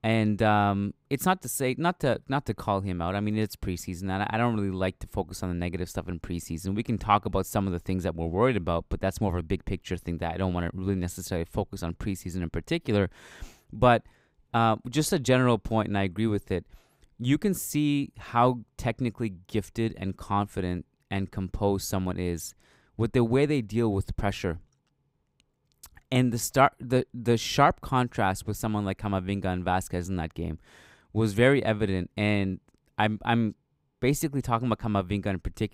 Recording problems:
none

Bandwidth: 15.5 kHz